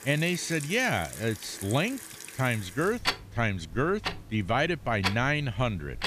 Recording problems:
household noises; loud; throughout; 8 dB below the speech

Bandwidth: 14.5 kHz